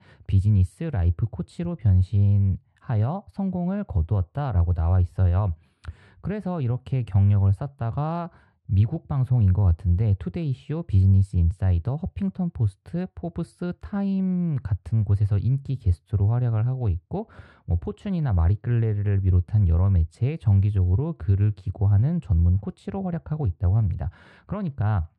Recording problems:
muffled; very; fading above 2 kHz

